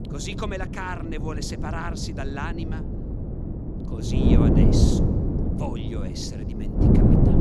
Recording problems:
wind noise on the microphone; heavy; 2 dB above the speech

